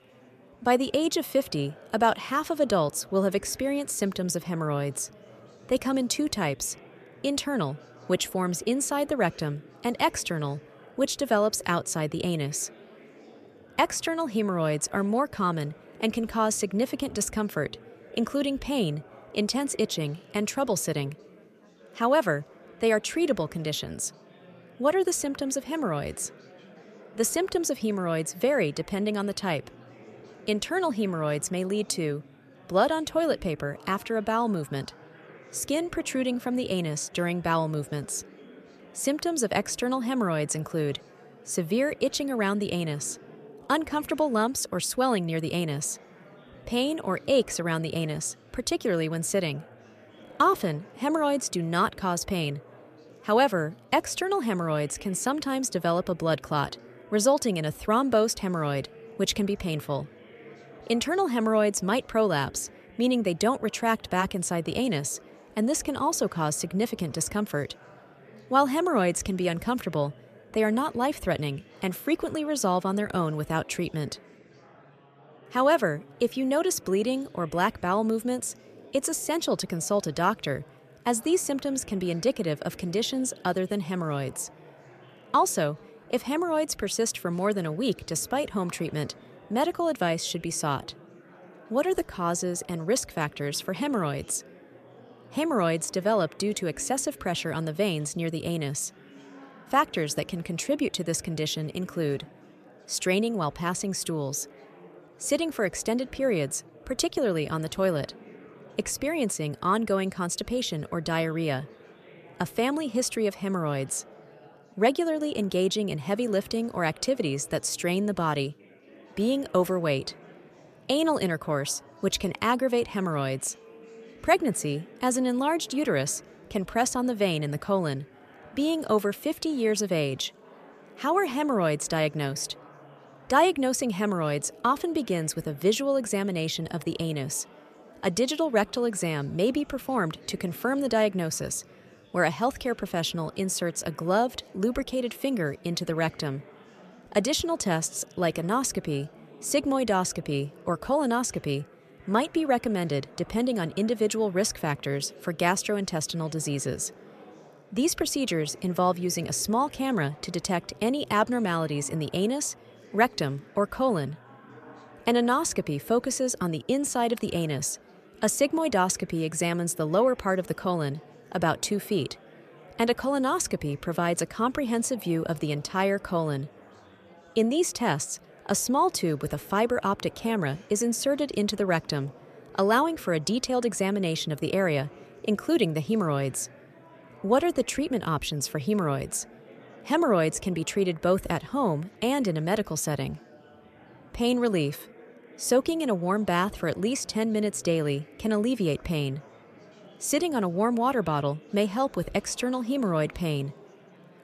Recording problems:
chatter from many people; faint; throughout; 25 dB below the speech

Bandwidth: 14.5 kHz